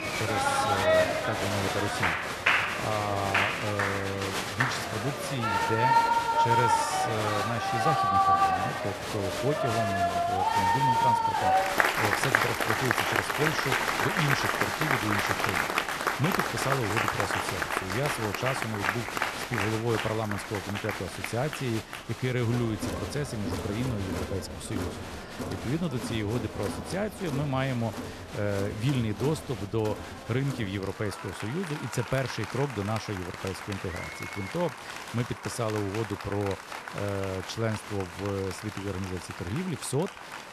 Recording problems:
crowd noise; very loud; throughout; 4 dB above the speech

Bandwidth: 13.5 kHz